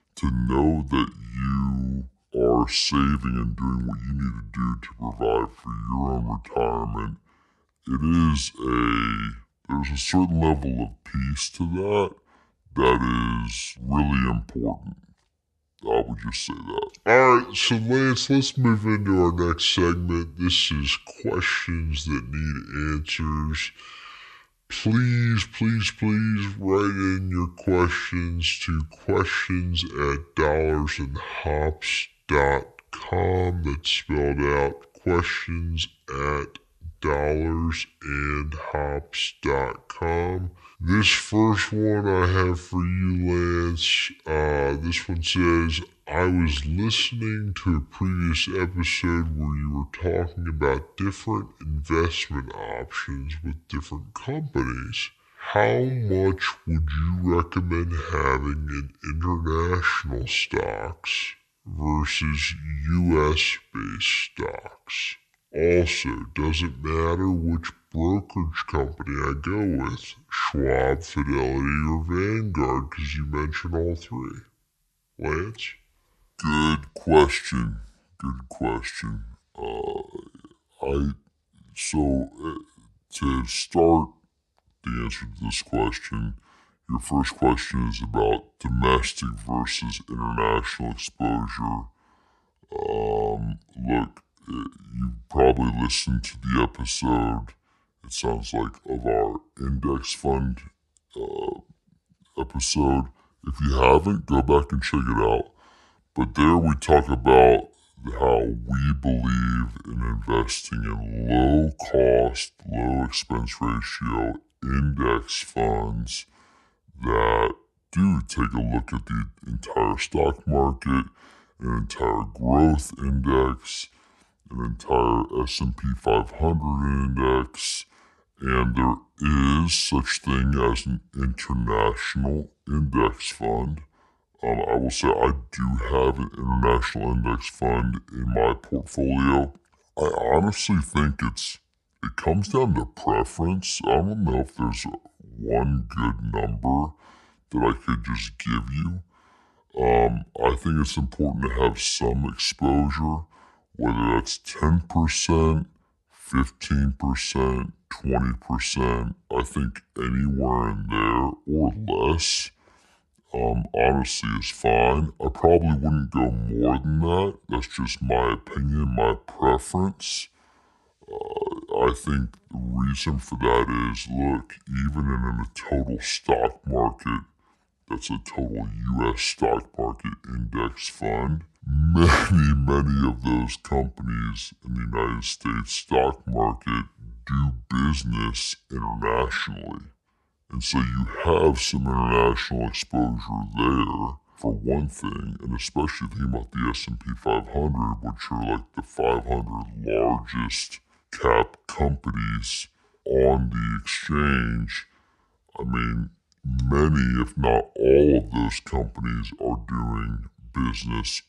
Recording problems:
wrong speed and pitch; too slow and too low; 0.6 times normal speed

